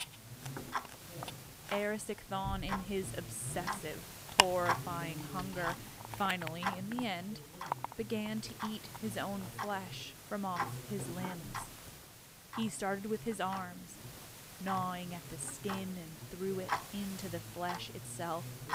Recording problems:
household noises; loud; throughout; 1 dB below the speech

